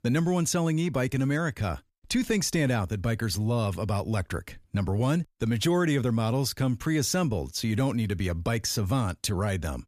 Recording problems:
none

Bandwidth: 14.5 kHz